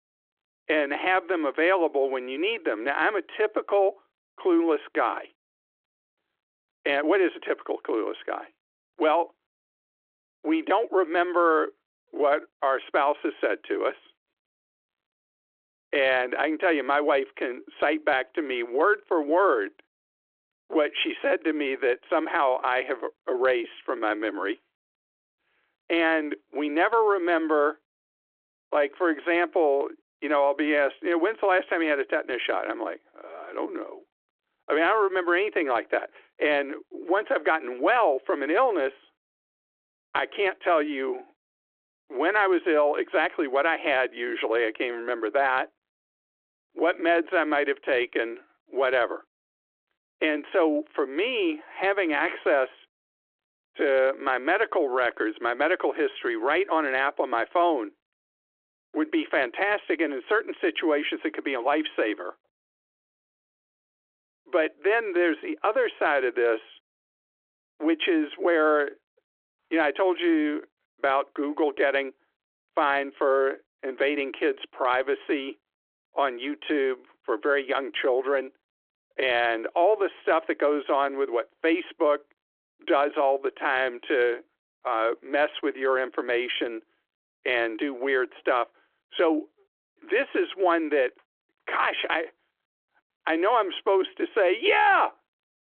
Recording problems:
phone-call audio

